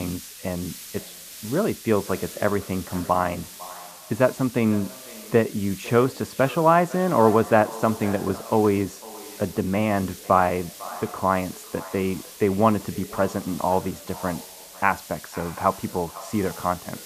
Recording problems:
muffled; very; fading above 2.5 kHz
echo of what is said; noticeable; throughout; 500 ms later, 20 dB below the speech
hiss; noticeable; throughout; 15 dB below the speech
abrupt cut into speech; at the start

